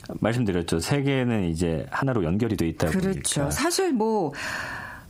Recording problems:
squashed, flat; heavily
uneven, jittery; strongly; from 0.5 to 3.5 s

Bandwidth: 15.5 kHz